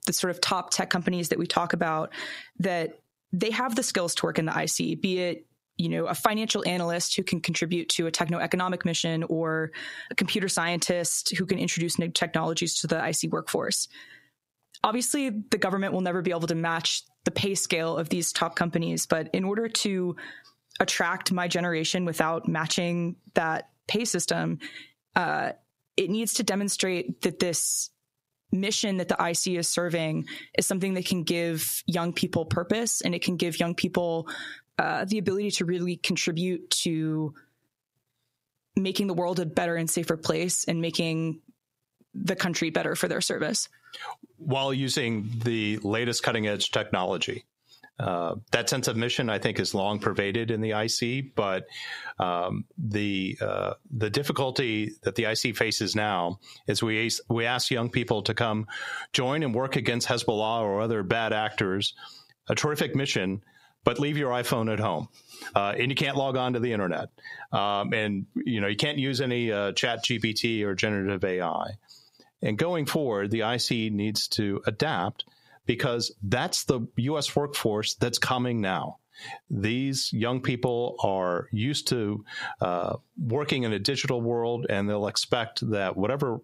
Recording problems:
squashed, flat; heavily

